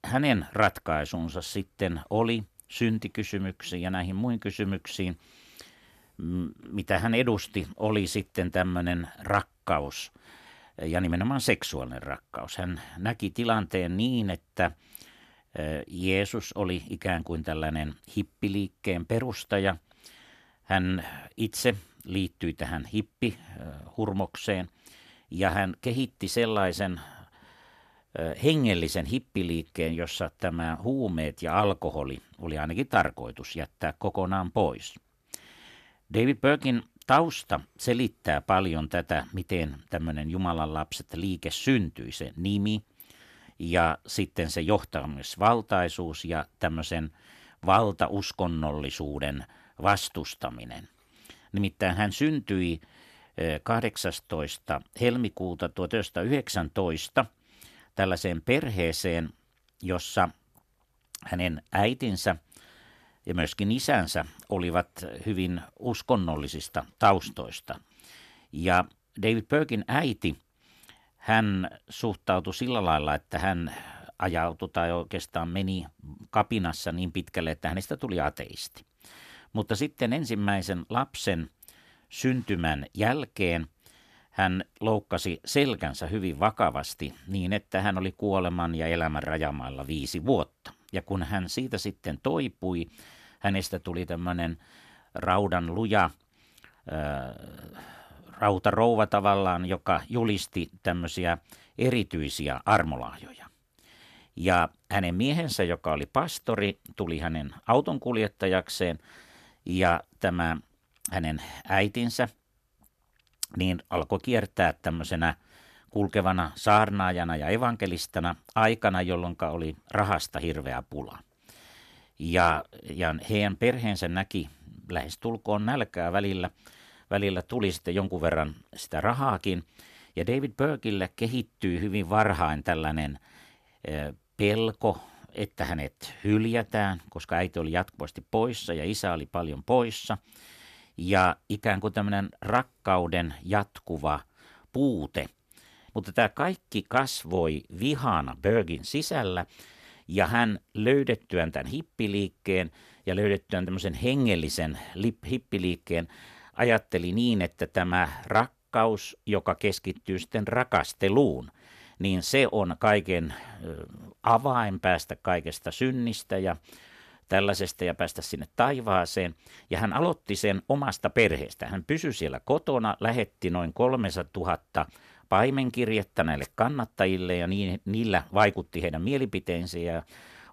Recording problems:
none

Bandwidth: 14 kHz